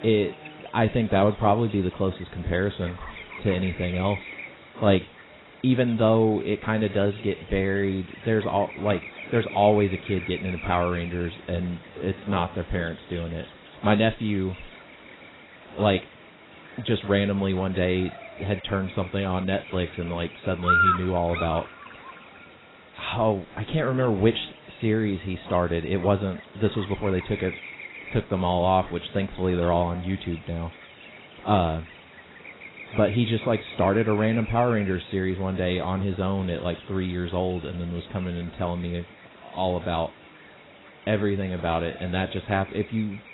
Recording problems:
garbled, watery; badly; nothing above 4 kHz
electrical hum; loud; throughout; 60 Hz, 7 dB below the speech
uneven, jittery; strongly; from 0.5 to 39 s

